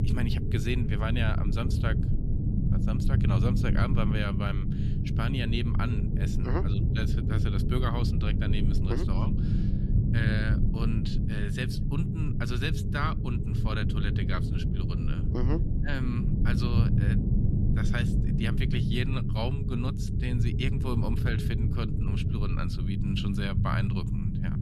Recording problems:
low rumble; loud; throughout; 3 dB below the speech

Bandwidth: 13.5 kHz